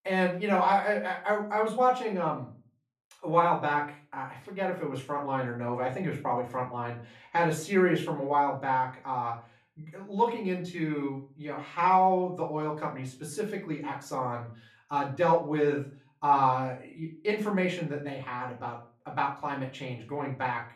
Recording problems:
off-mic speech; far
room echo; slight; dies away in 0.3 s

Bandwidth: 14.5 kHz